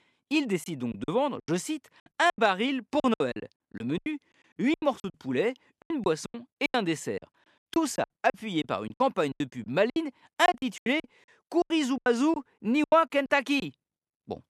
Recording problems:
choppy; very; 18% of the speech affected

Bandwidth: 13.5 kHz